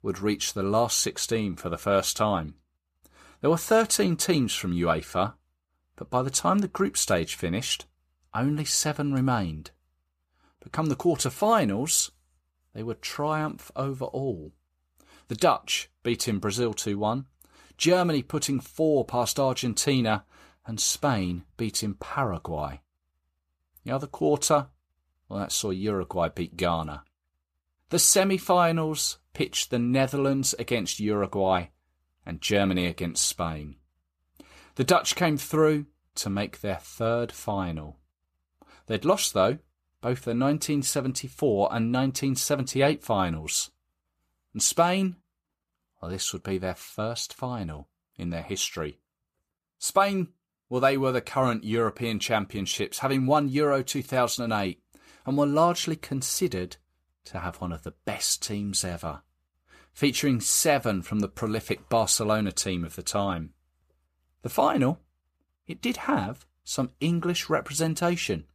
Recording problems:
none

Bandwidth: 14.5 kHz